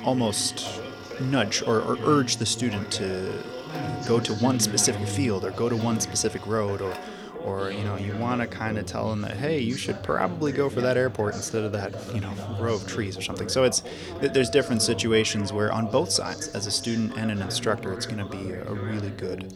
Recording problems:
background chatter; loud; throughout; 2 voices, 9 dB below the speech
household noises; noticeable; throughout; 15 dB below the speech

